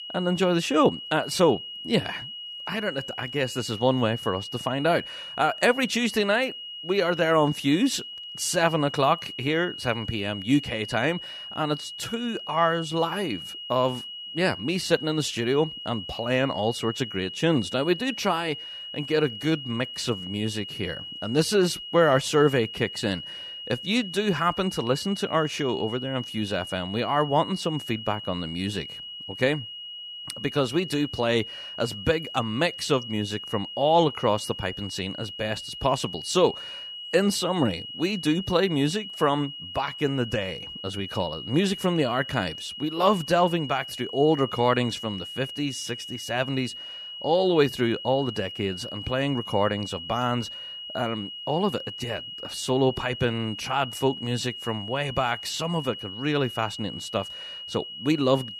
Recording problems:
high-pitched whine; loud; throughout; 3 kHz, 9 dB below the speech

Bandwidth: 14 kHz